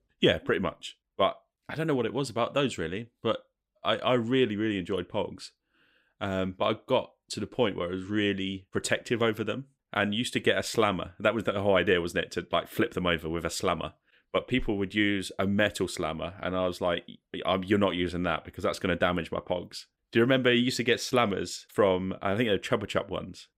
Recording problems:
none

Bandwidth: 15.5 kHz